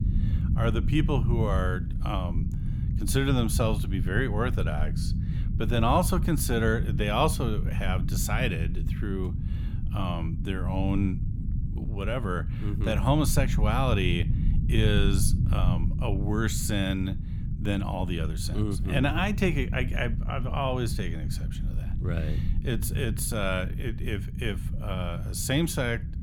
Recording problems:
low rumble; noticeable; throughout; 10 dB below the speech

